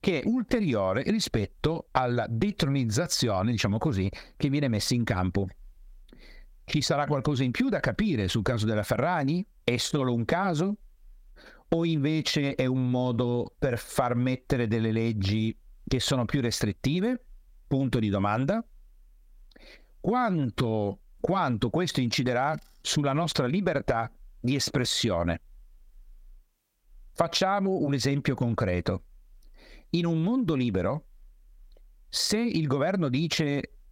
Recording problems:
squashed, flat; somewhat

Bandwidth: 16 kHz